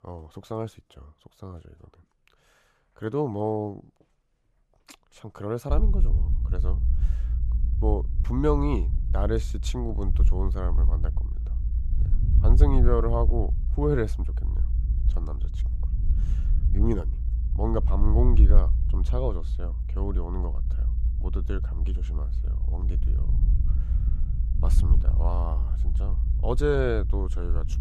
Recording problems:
low rumble; noticeable; from 5.5 s on; 15 dB below the speech

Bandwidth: 14 kHz